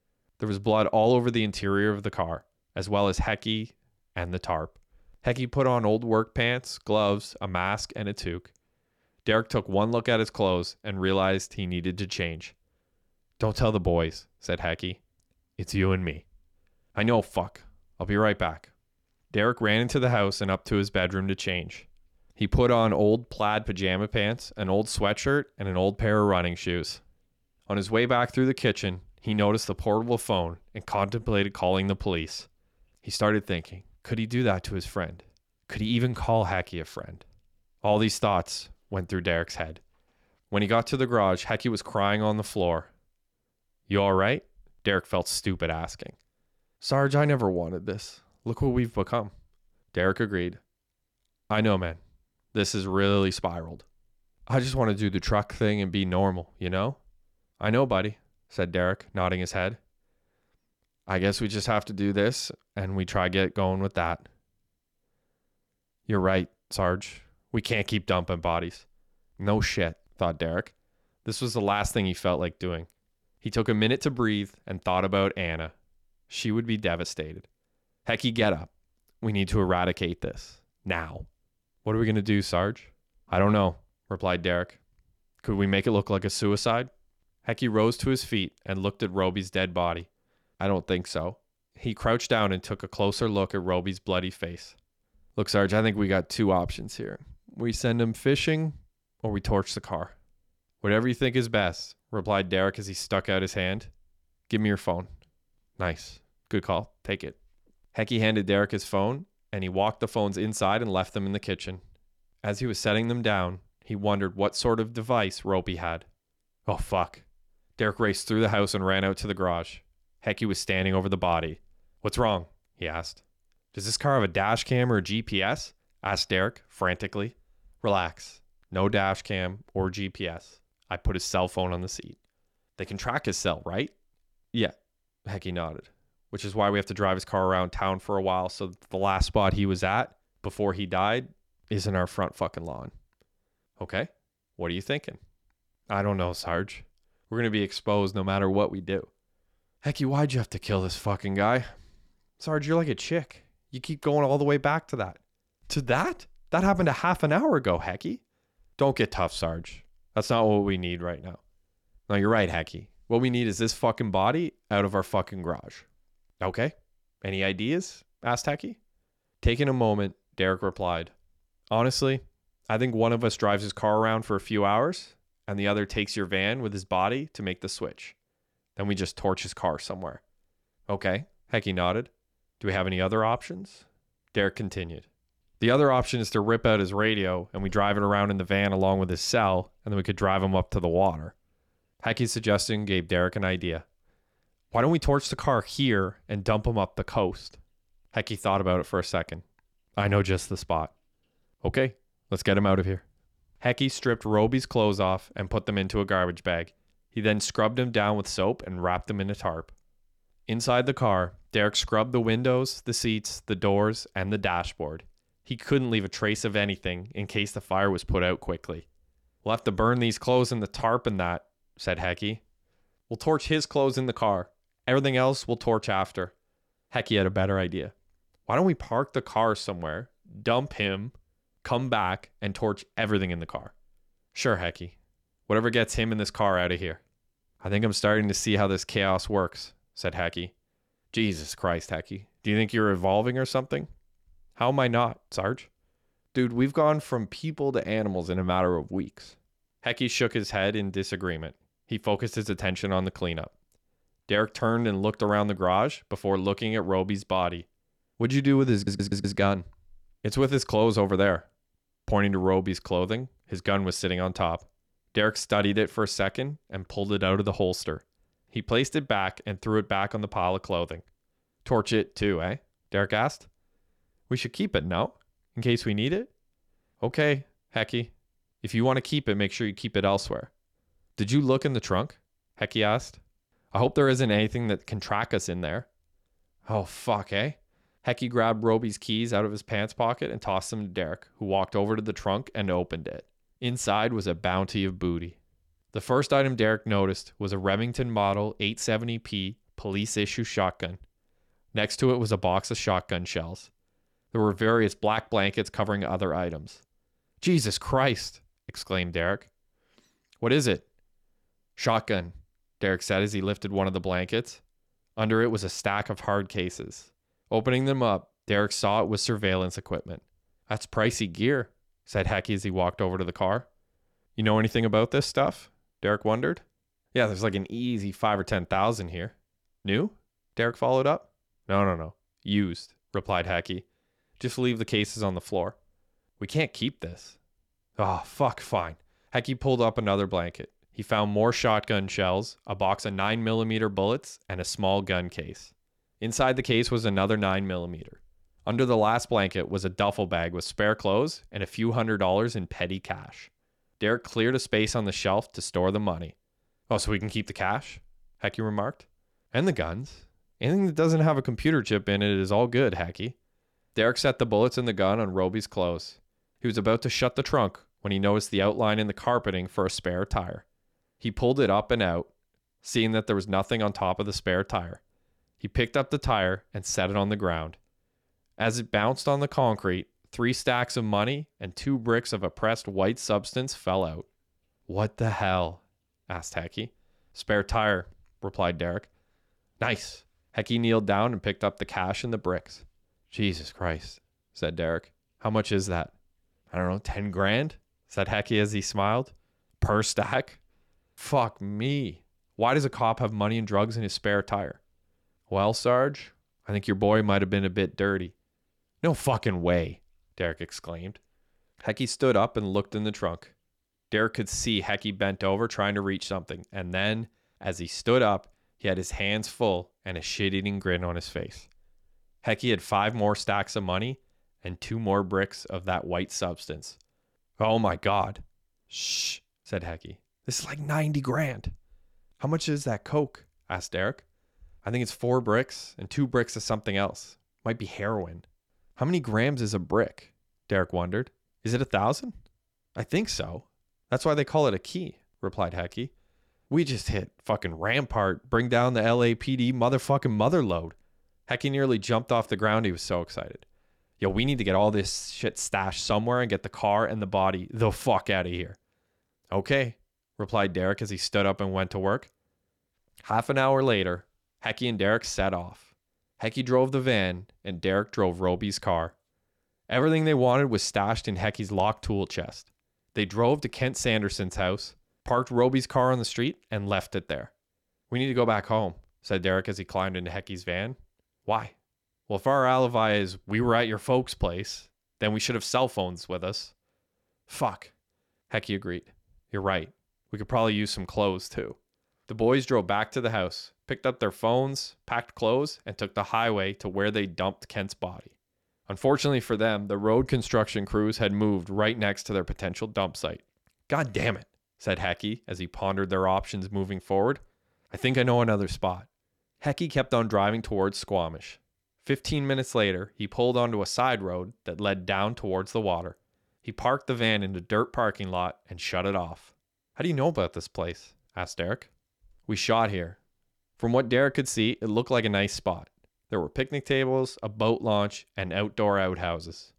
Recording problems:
audio stuttering; at 4:19

